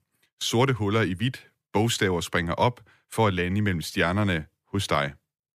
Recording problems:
none

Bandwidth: 15 kHz